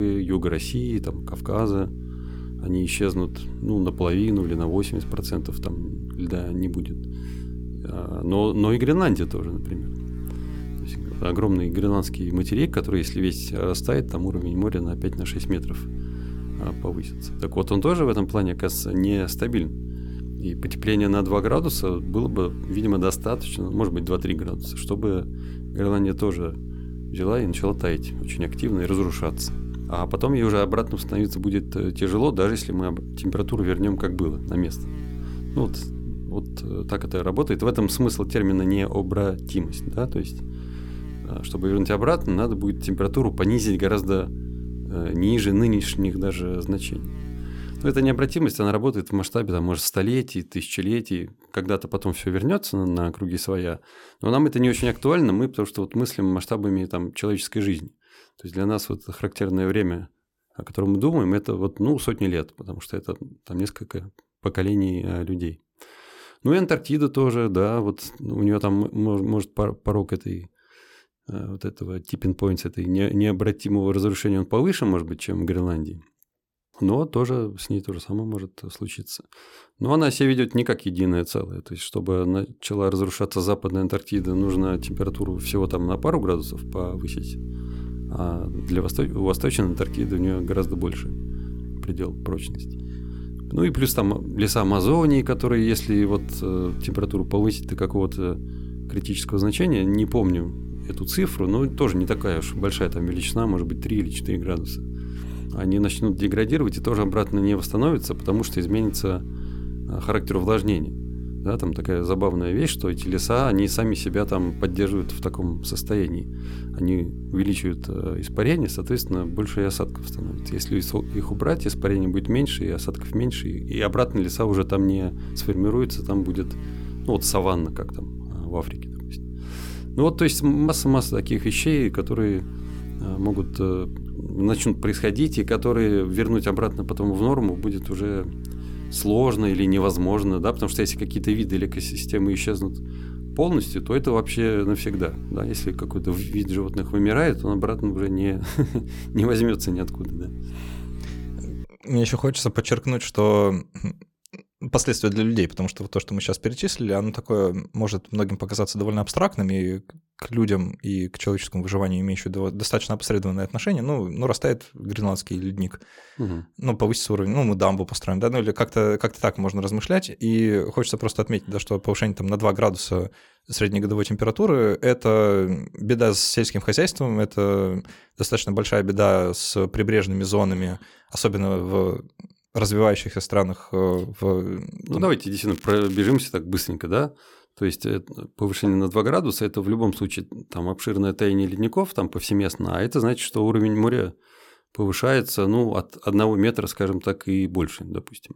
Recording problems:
electrical hum; noticeable; until 48 s and from 1:24 to 2:32; 60 Hz, 15 dB below the speech
crackling; noticeable; at 3:05; 20 dB below the speech
abrupt cut into speech; at the start

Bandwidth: 17 kHz